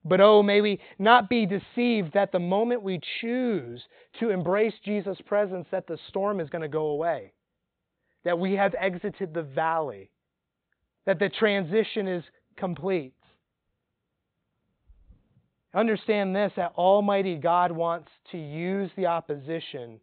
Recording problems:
high frequencies cut off; severe; nothing above 4 kHz

